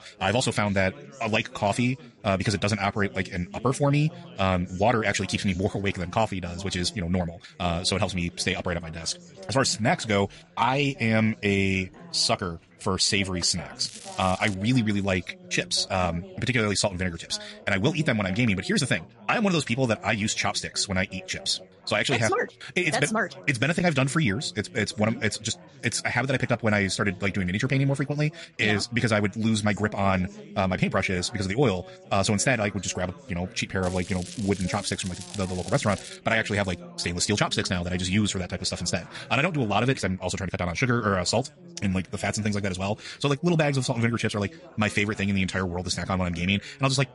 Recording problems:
wrong speed, natural pitch; too fast; 1.6 times normal speed
garbled, watery; slightly; nothing above 11 kHz
crackling; noticeable; at 14 s and from 34 to 36 s; 15 dB below the speech
background chatter; faint; throughout; 4 voices, 20 dB below the speech

